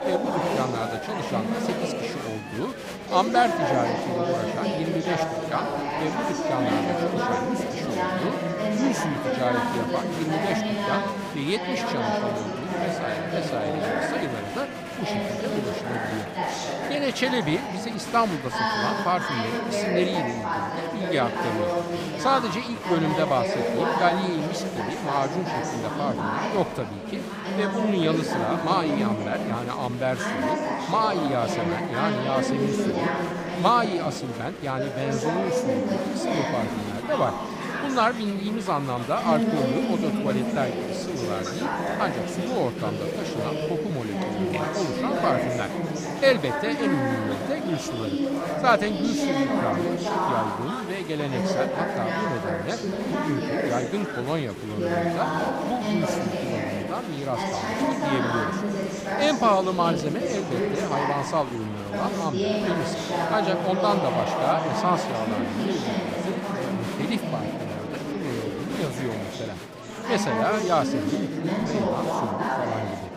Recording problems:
chatter from many people; very loud; throughout; 1 dB above the speech

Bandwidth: 15.5 kHz